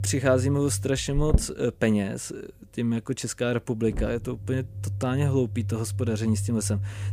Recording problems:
low rumble; noticeable; throughout; 15 dB below the speech

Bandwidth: 15 kHz